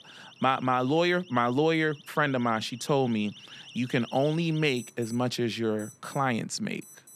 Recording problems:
alarms or sirens; noticeable; throughout; 20 dB below the speech

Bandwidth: 14 kHz